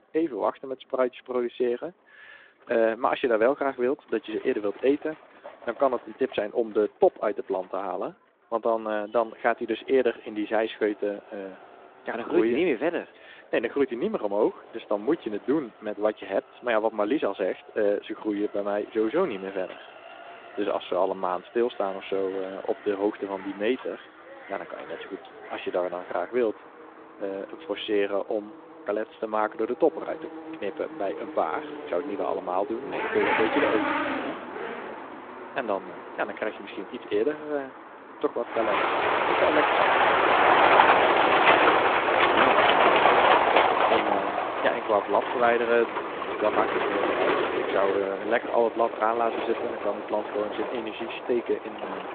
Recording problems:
phone-call audio
traffic noise; very loud; throughout; 4 dB above the speech

